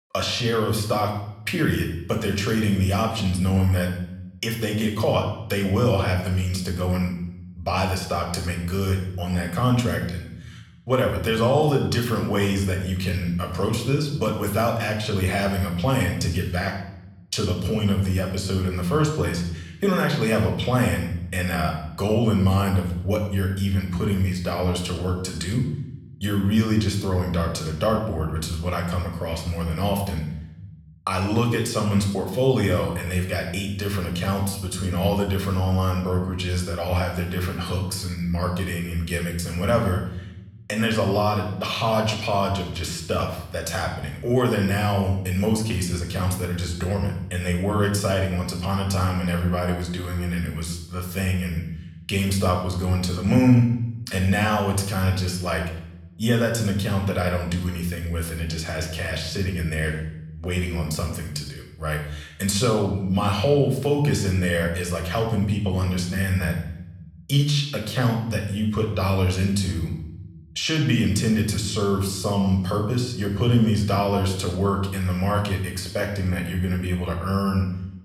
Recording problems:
room echo; noticeable; dies away in 0.8 s
off-mic speech; somewhat distant

